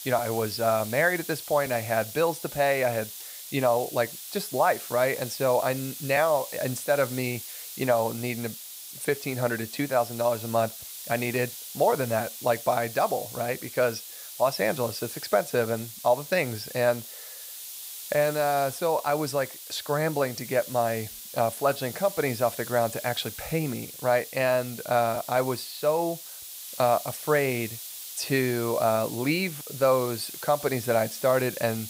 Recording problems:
hiss; noticeable; throughout; 10 dB below the speech

